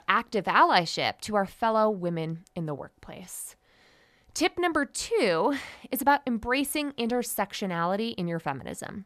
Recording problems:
none

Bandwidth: 14 kHz